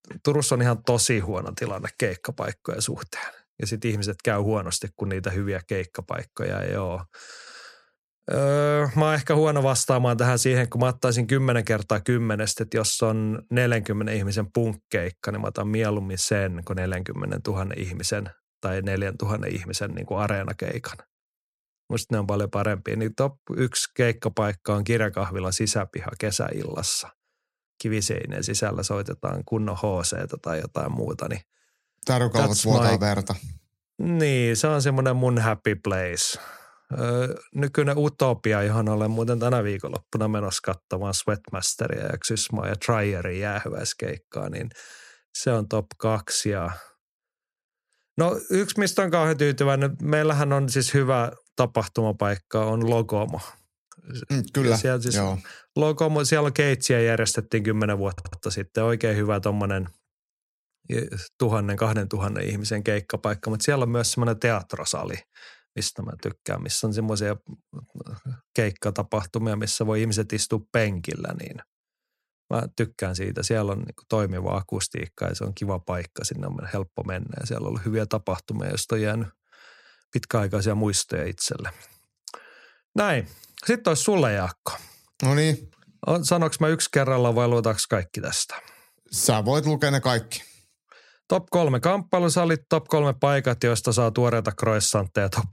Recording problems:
audio stuttering; at 58 s

